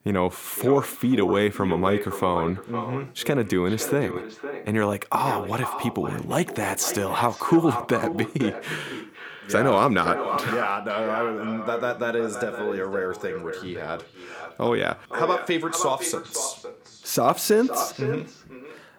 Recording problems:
echo of what is said; strong; throughout; 510 ms later, 8 dB below the speech

